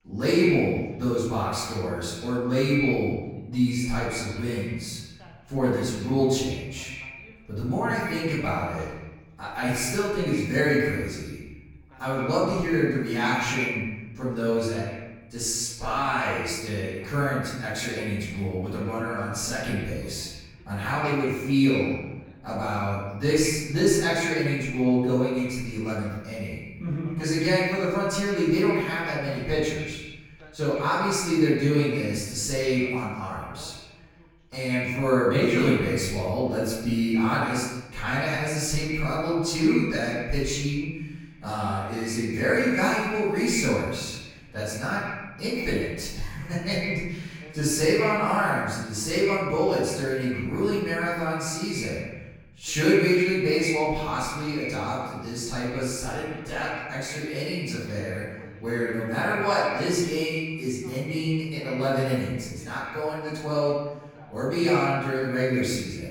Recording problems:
echo of what is said; strong; throughout; 130 ms later, 9 dB below the speech
off-mic speech; far
room echo; noticeable; dies away in 1 s
voice in the background; faint; throughout; 25 dB below the speech

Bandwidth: 18 kHz